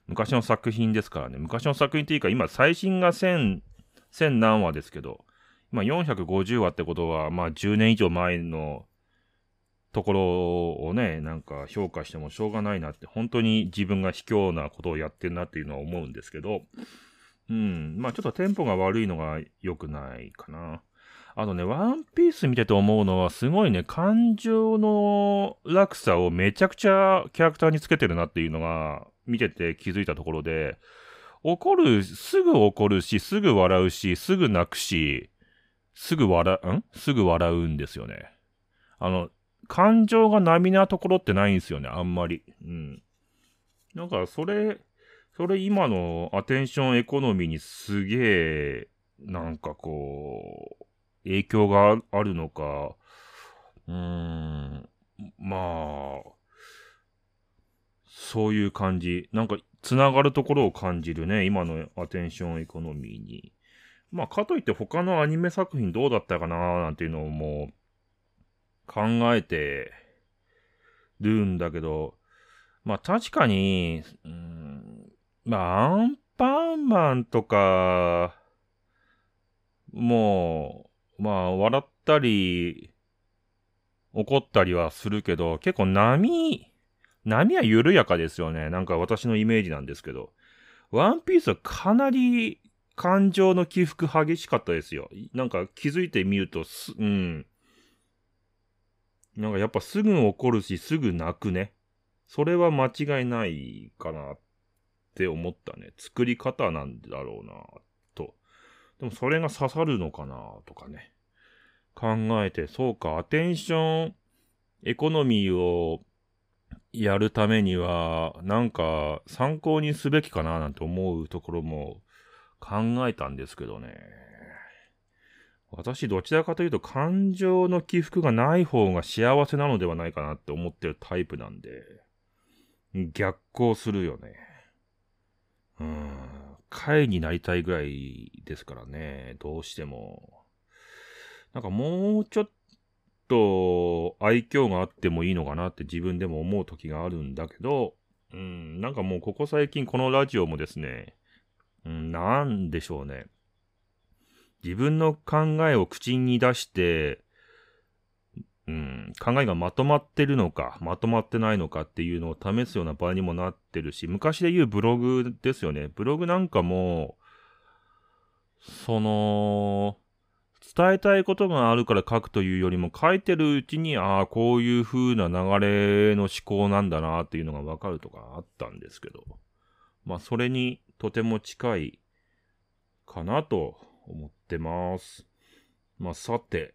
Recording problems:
none

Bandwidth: 15.5 kHz